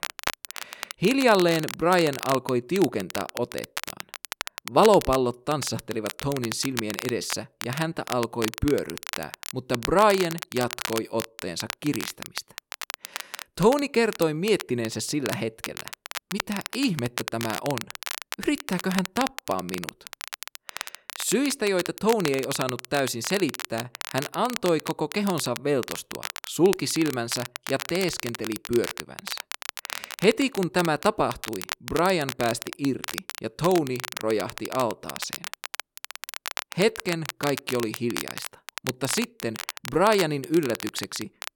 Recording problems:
crackle, like an old record; loud; 9 dB below the speech

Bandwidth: 17.5 kHz